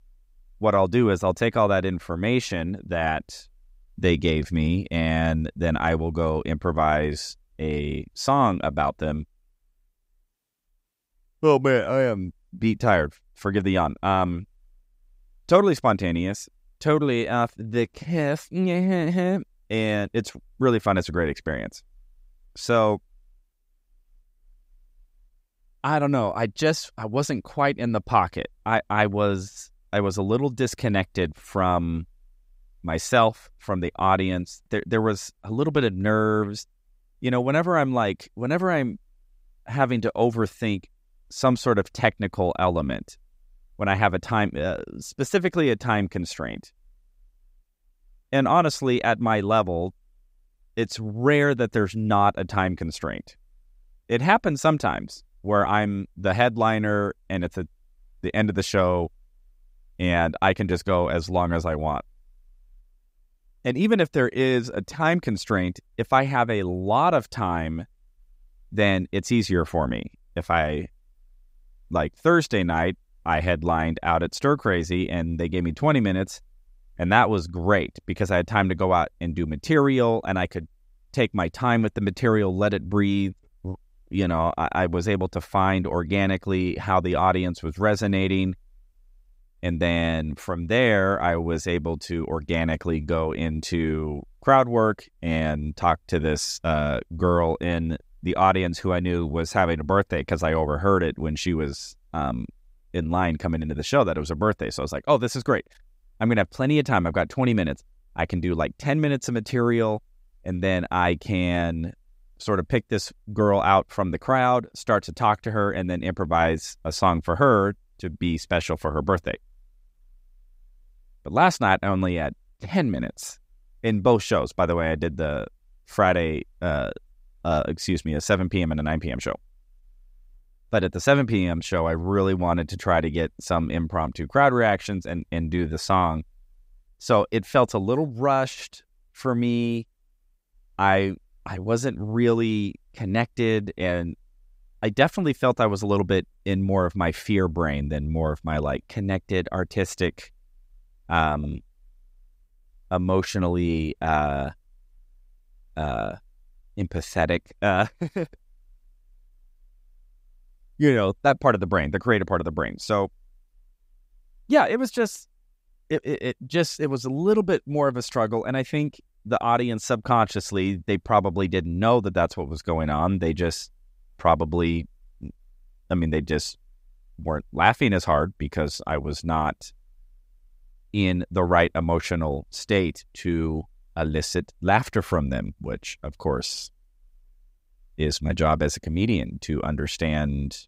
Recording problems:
none

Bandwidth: 15.5 kHz